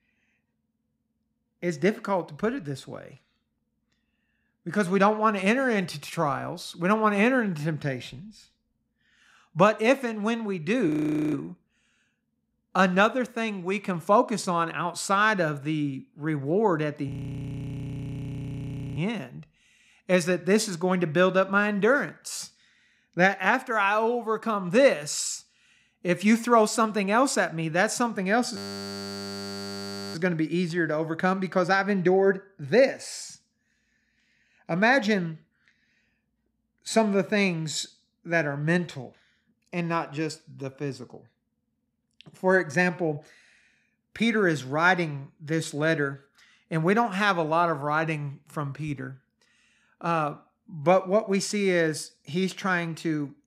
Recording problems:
audio freezing; at 11 s, at 17 s for 2 s and at 29 s for 1.5 s

